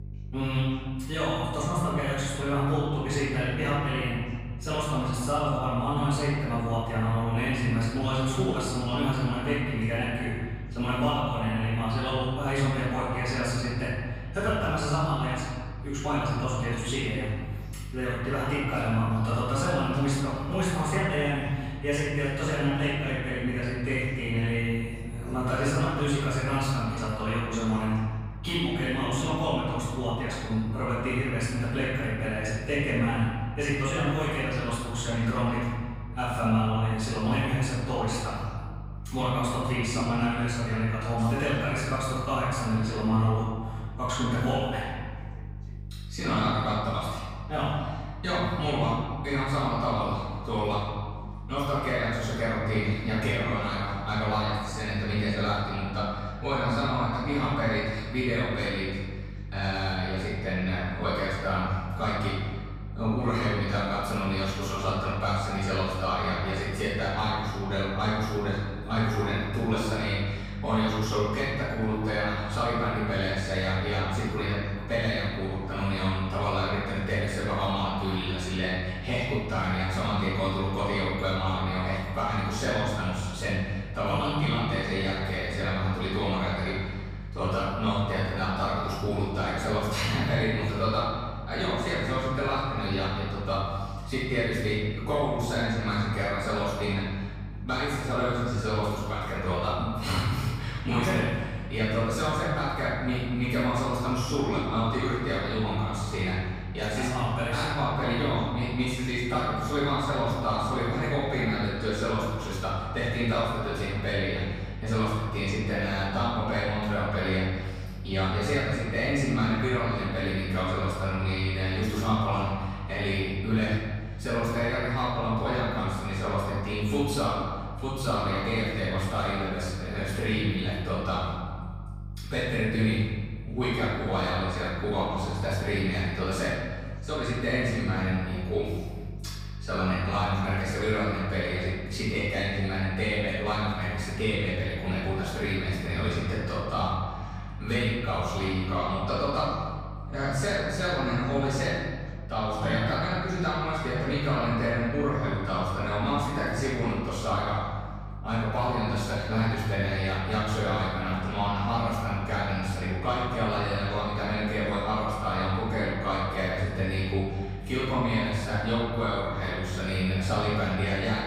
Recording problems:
room echo; strong; dies away in 1.5 s
off-mic speech; far
electrical hum; faint; throughout; 50 Hz, 25 dB below the speech
voice in the background; faint; throughout; 30 dB below the speech

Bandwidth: 15.5 kHz